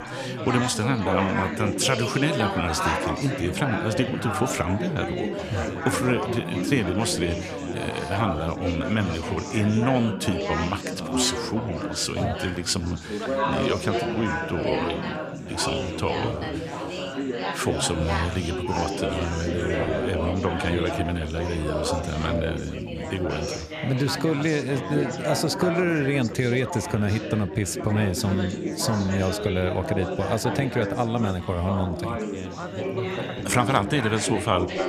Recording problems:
chatter from many people; loud; throughout; 3 dB below the speech

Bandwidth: 14.5 kHz